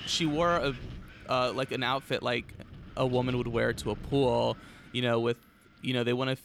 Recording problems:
wind noise on the microphone; occasional gusts; 20 dB below the speech

